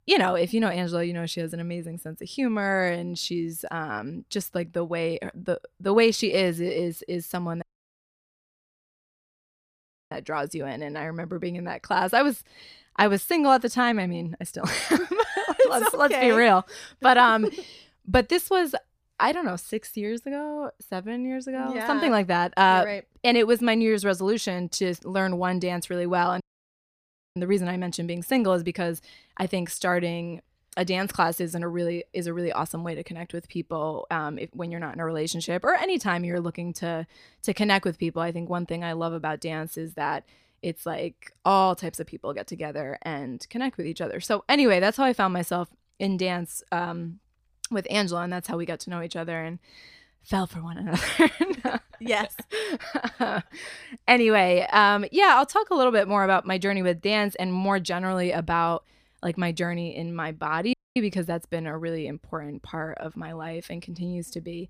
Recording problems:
audio cutting out; at 7.5 s for 2.5 s, at 26 s for 1 s and at 1:01

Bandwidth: 15 kHz